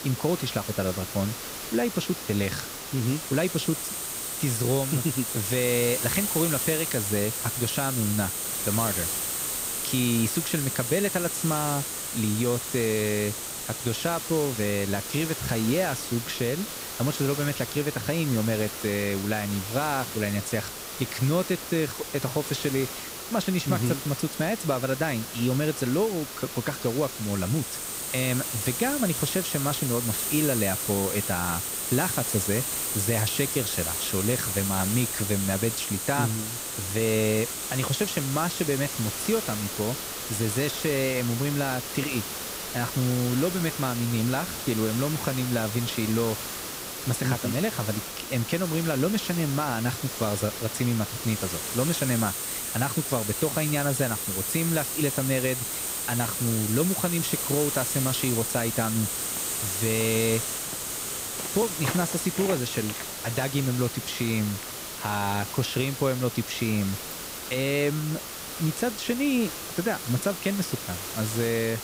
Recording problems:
hiss; loud; throughout; 2 dB below the speech
footsteps; noticeable; from 59 s to 1:05; peak 8 dB below the speech
jangling keys; very faint; at 1:07; peak 20 dB below the speech

